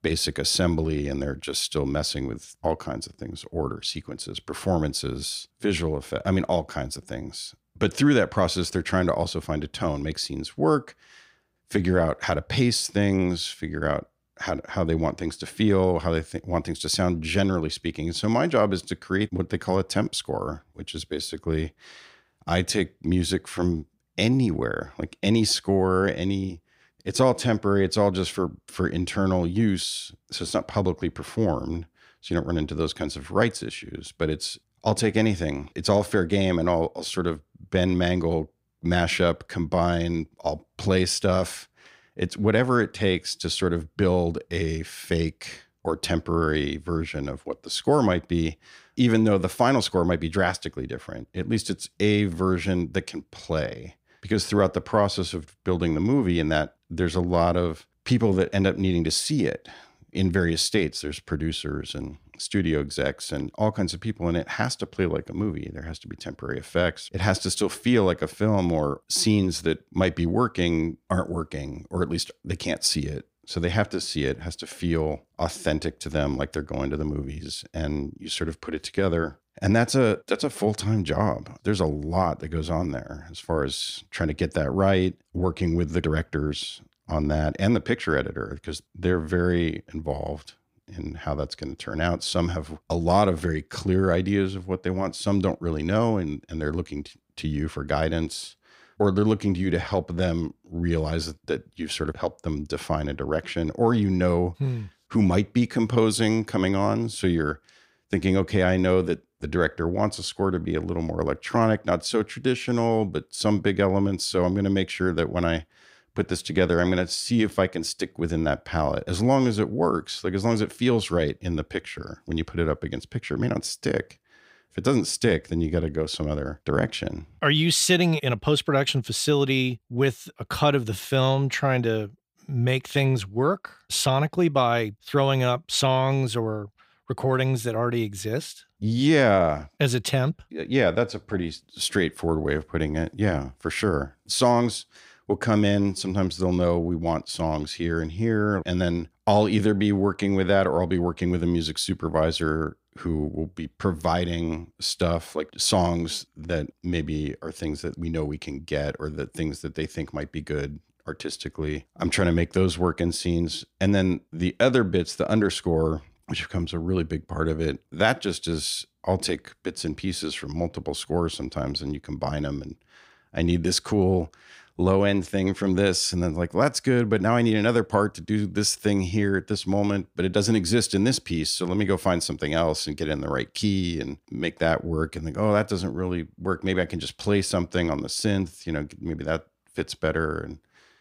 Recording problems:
none

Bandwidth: 15.5 kHz